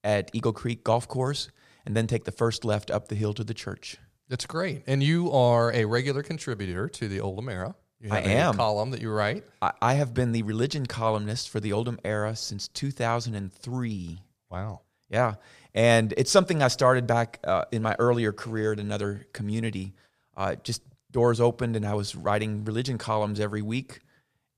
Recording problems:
none

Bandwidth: 14.5 kHz